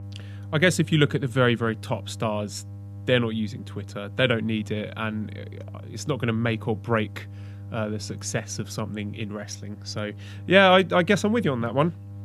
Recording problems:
electrical hum; faint; throughout; 50 Hz, 25 dB below the speech

